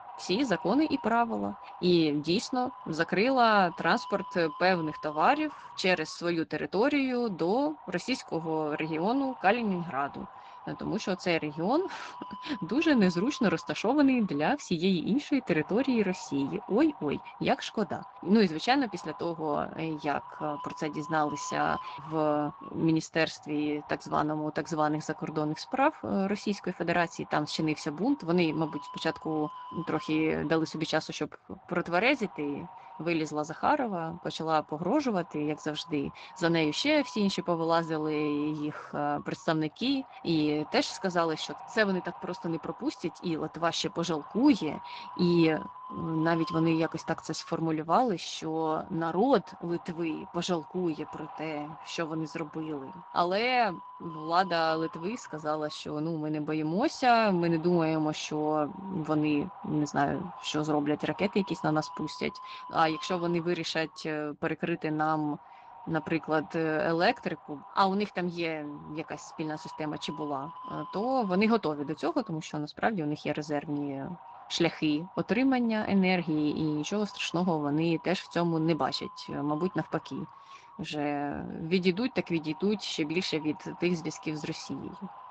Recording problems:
garbled, watery; slightly
wind noise on the microphone; occasional gusts; 15 dB below the speech

